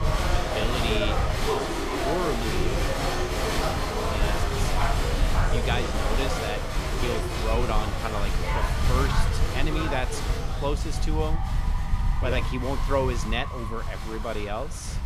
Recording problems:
crowd noise; very loud; throughout; 2 dB above the speech
low rumble; noticeable; throughout; 15 dB below the speech

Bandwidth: 15 kHz